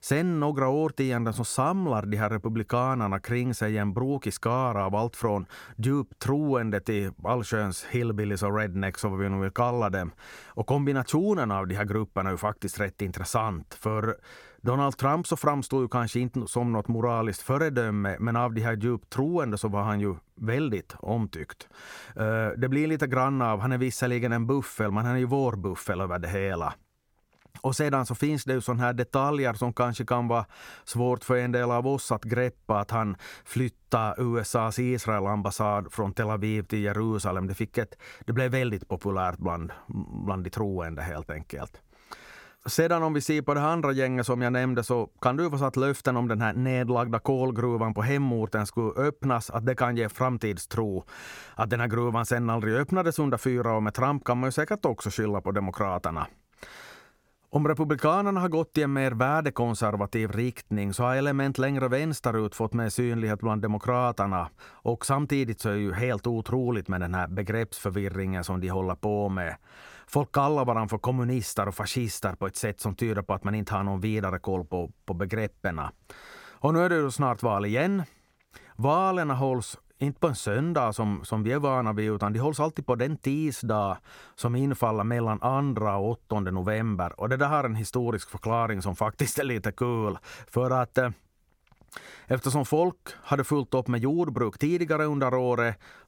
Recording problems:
none

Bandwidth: 17 kHz